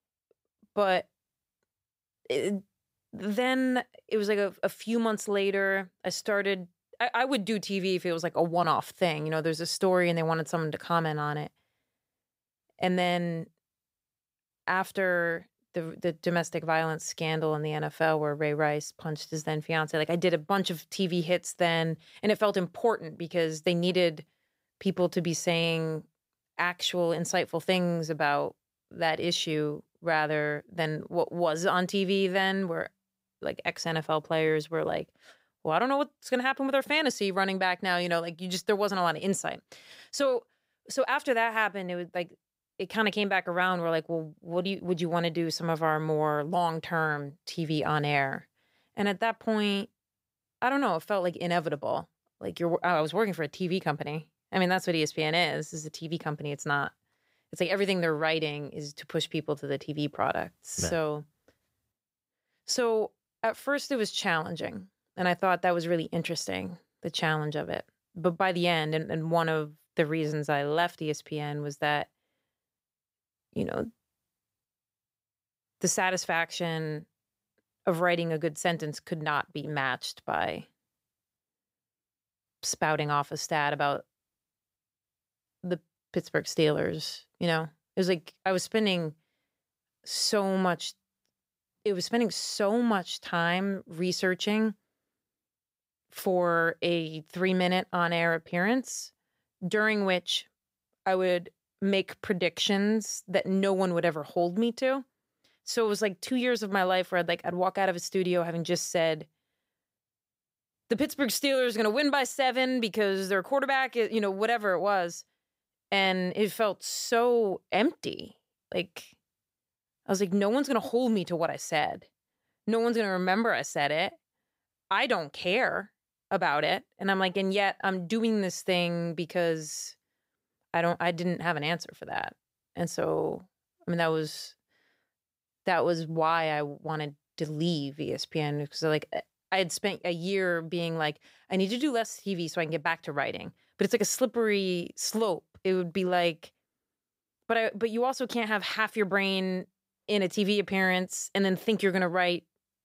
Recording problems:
none

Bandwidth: 15.5 kHz